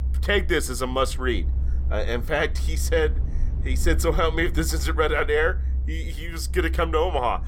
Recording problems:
low rumble; faint; throughout; 20 dB below the speech

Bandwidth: 16.5 kHz